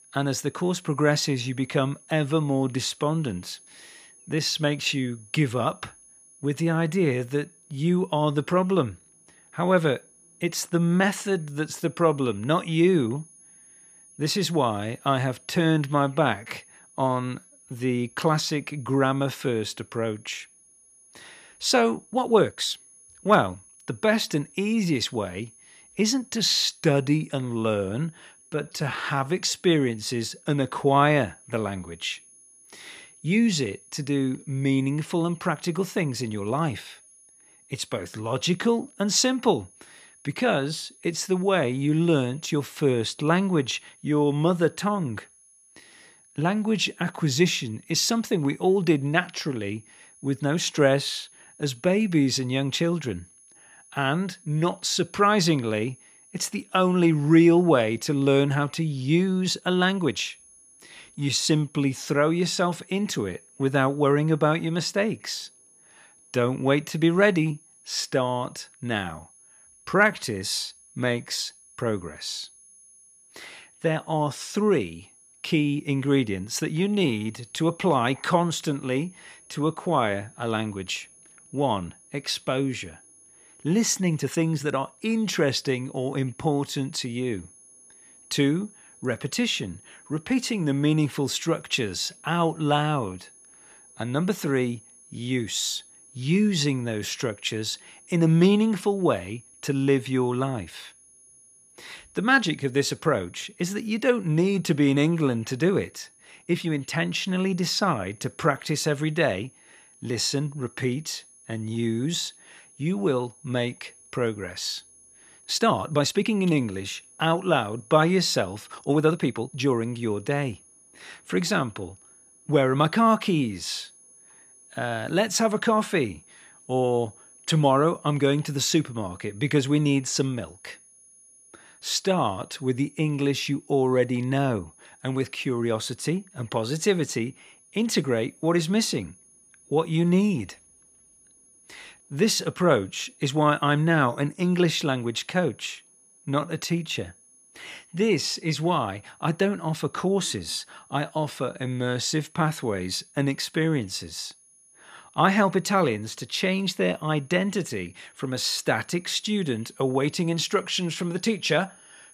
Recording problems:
high-pitched whine; faint; throughout; 10.5 kHz, 25 dB below the speech
uneven, jittery; strongly; from 22 s to 2:27

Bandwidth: 14.5 kHz